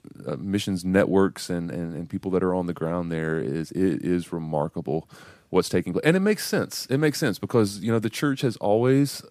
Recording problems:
none

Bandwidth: 15 kHz